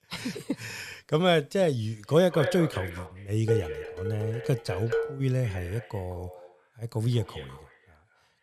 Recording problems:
echo of what is said; strong; from 2 s on; 210 ms later, 10 dB below the speech
clattering dishes; noticeable; from 3.5 to 5 s; peak 2 dB below the speech

